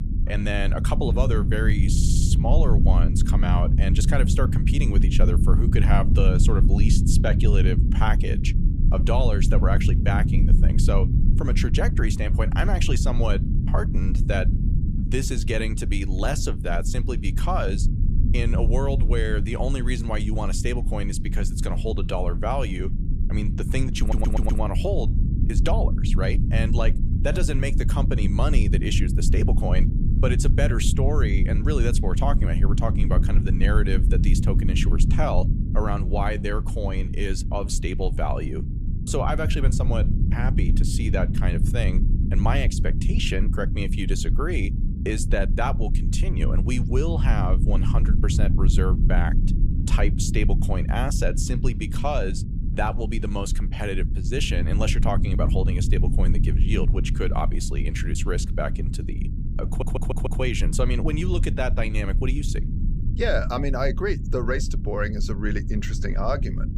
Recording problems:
low rumble; loud; throughout; 7 dB below the speech
audio stuttering; at 2 s, at 24 s and at 1:00

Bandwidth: 15 kHz